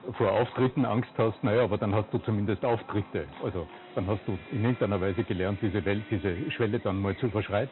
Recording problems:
high frequencies cut off; severe; nothing above 4 kHz
distortion; slight; 6% of the sound clipped
animal sounds; noticeable; throughout; 20 dB below the speech
background music; faint; throughout; 20 dB below the speech

